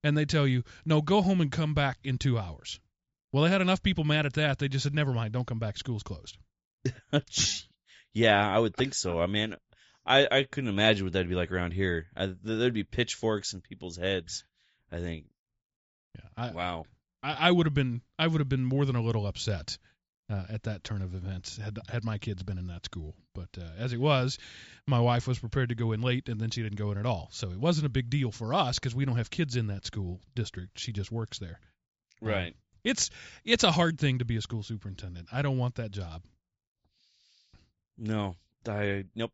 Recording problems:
high frequencies cut off; noticeable; nothing above 8 kHz

